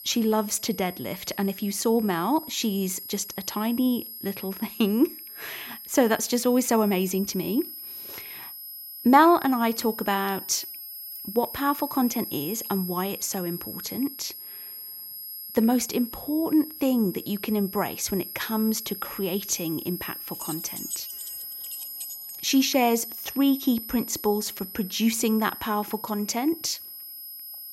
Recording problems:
high-pitched whine; noticeable; throughout; 11.5 kHz, 10 dB below the speech
jangling keys; noticeable; from 20 to 22 s; peak 9 dB below the speech

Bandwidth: 16 kHz